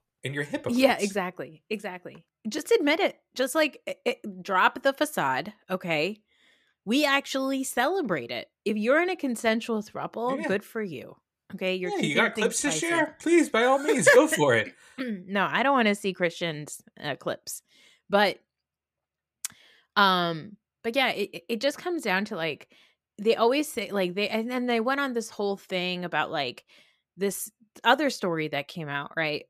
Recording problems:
none

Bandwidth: 14.5 kHz